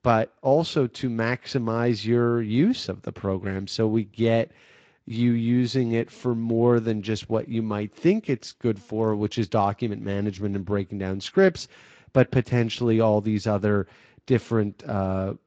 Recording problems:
garbled, watery; slightly; nothing above 7.5 kHz

